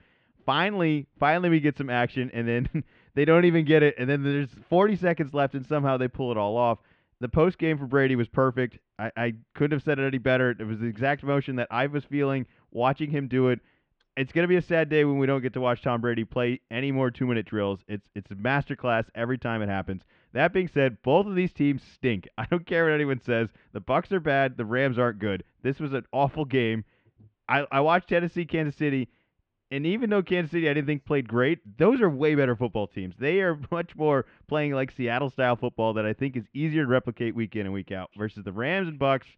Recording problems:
muffled; very; fading above 3 kHz

